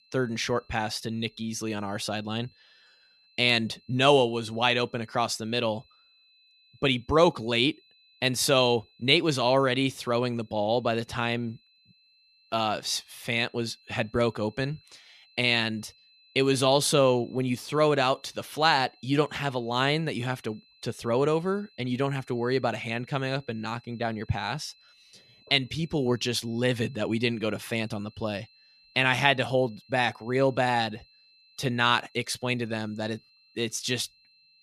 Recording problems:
high-pitched whine; faint; throughout; 4 kHz, 30 dB below the speech

